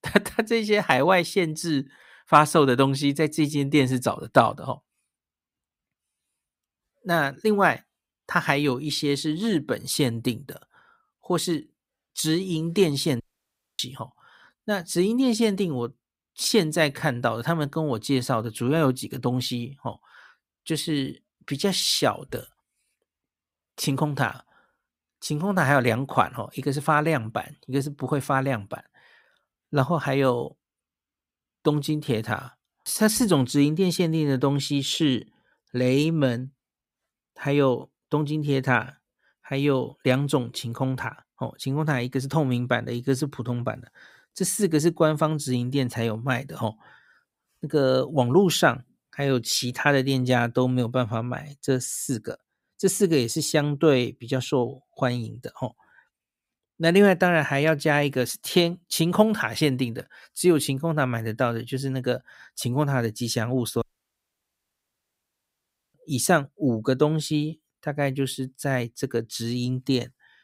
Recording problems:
audio cutting out; at 13 s for 0.5 s and at 1:04 for 2 s

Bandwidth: 15.5 kHz